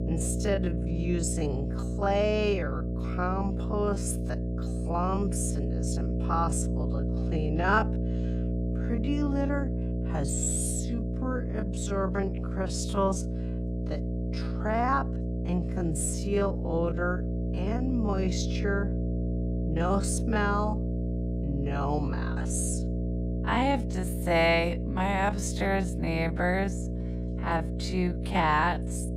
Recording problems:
wrong speed, natural pitch; too slow; 0.5 times normal speed
electrical hum; loud; throughout; 60 Hz, 10 dB below the speech

